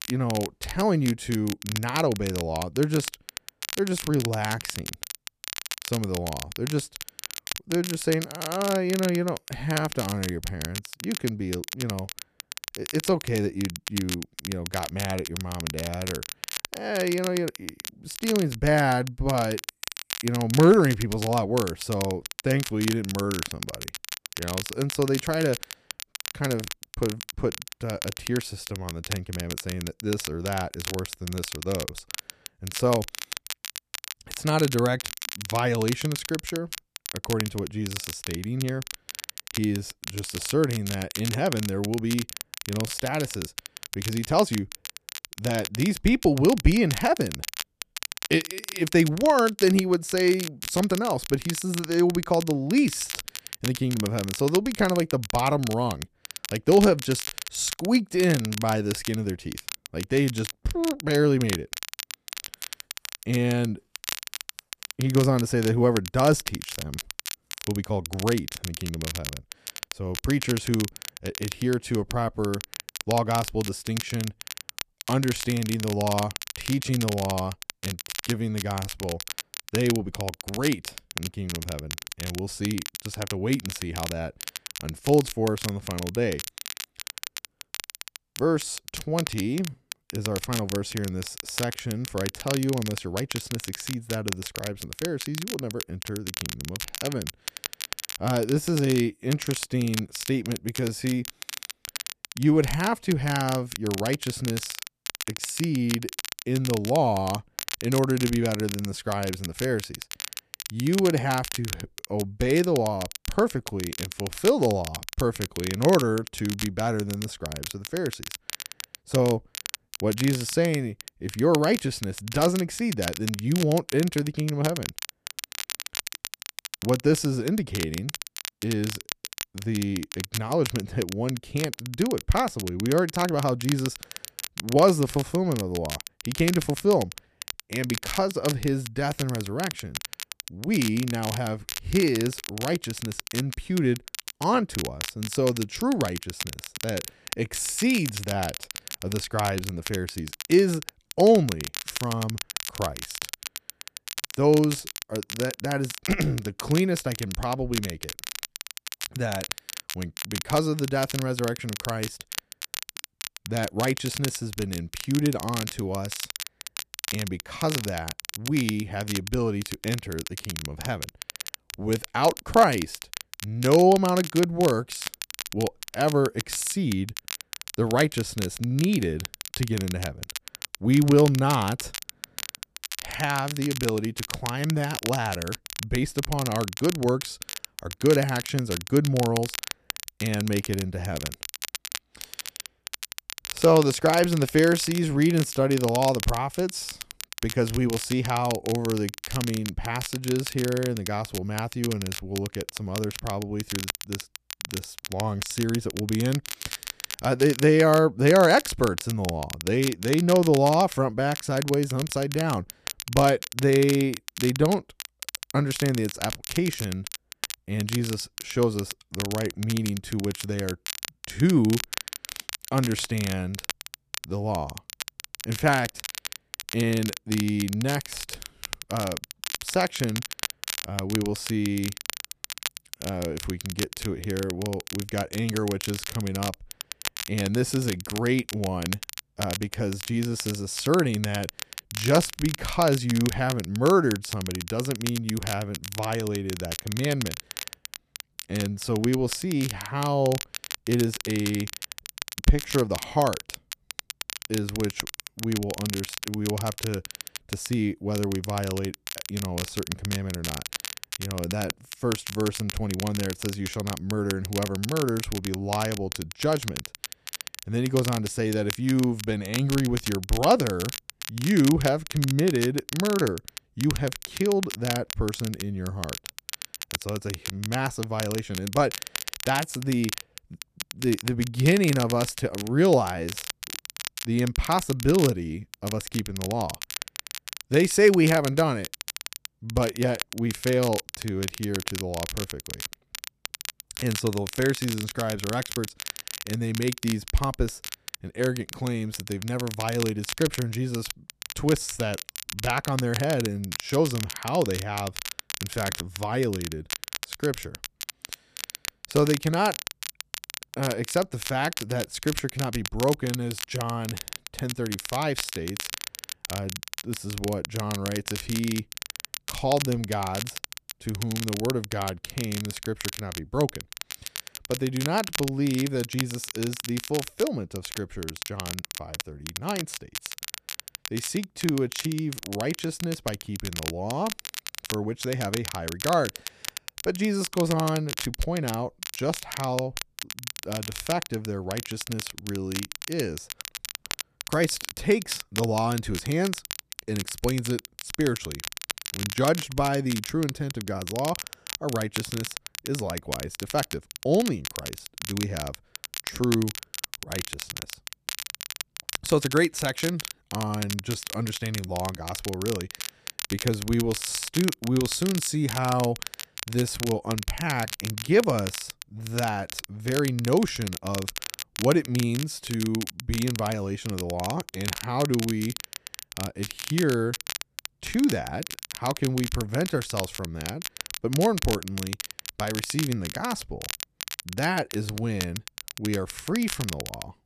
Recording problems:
crackle, like an old record; loud; 8 dB below the speech

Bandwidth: 14.5 kHz